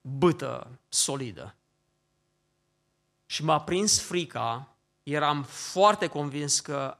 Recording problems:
none

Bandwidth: 14 kHz